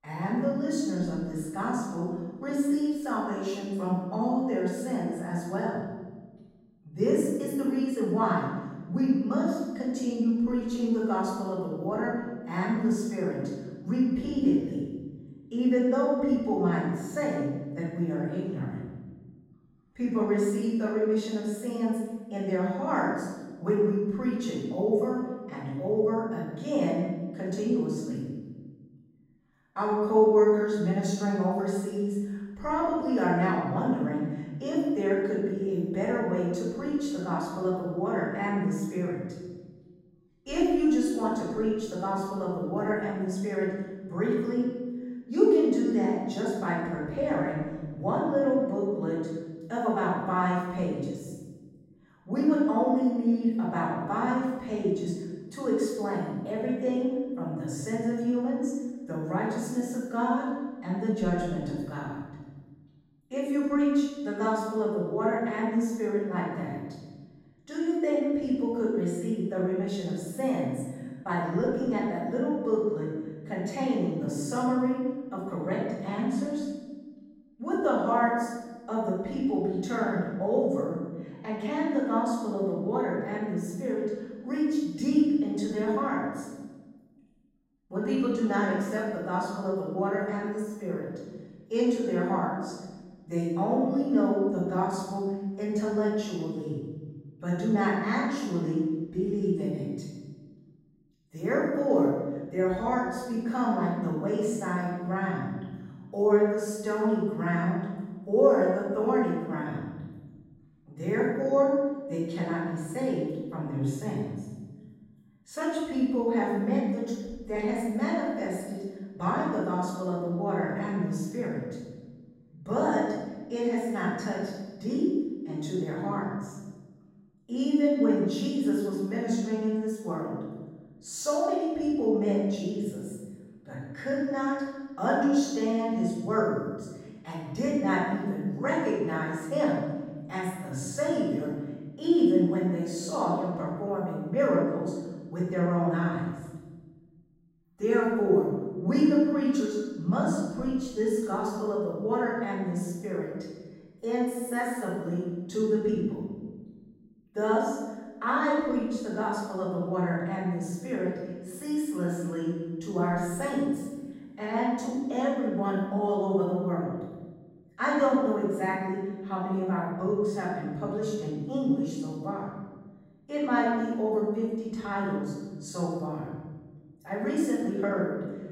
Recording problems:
room echo; strong; dies away in 1.2 s
off-mic speech; far

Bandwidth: 16 kHz